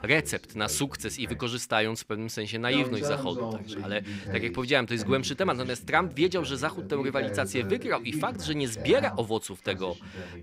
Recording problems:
voice in the background; loud; throughout; 9 dB below the speech

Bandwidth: 15.5 kHz